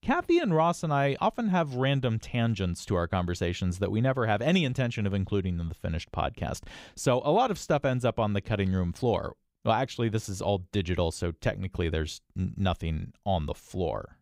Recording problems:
none

